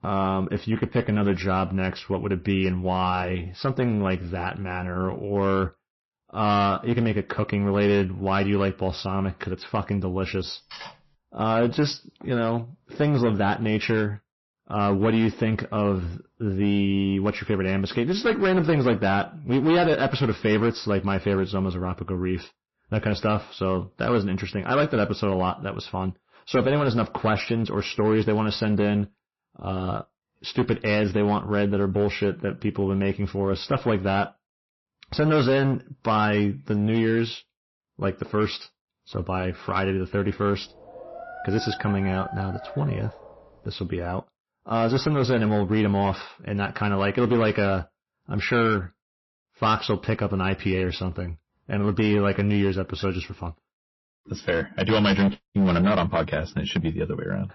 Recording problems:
distortion; slight; 7% of the sound clipped
garbled, watery; slightly; nothing above 5.5 kHz
clattering dishes; faint; at 11 s; peak 15 dB below the speech
dog barking; faint; from 41 to 43 s; peak 10 dB below the speech

